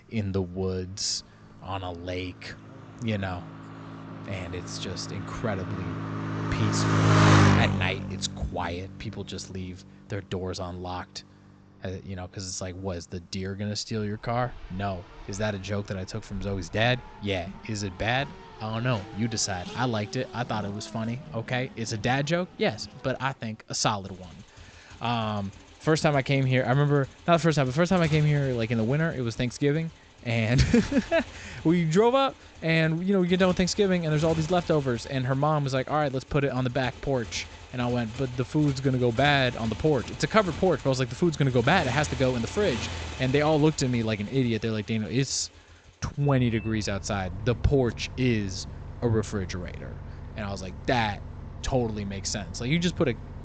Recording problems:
high frequencies cut off; noticeable; nothing above 8 kHz
traffic noise; loud; throughout; 6 dB below the speech

